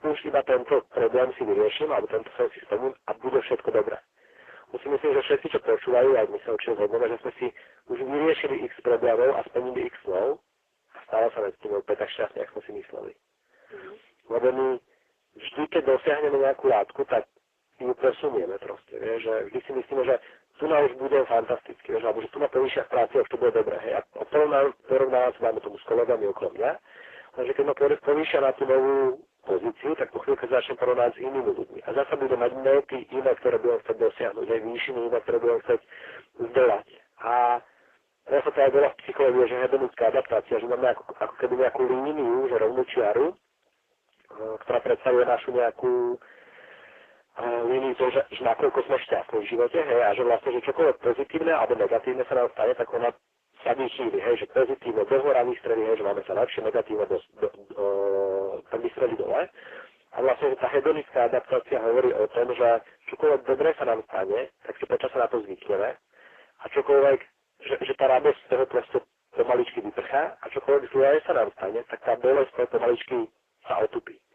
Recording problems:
phone-call audio; poor line
distortion; heavy; 8 dB below the speech
garbled, watery; slightly

